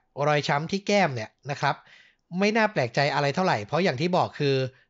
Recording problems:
high frequencies cut off; noticeable; nothing above 7.5 kHz

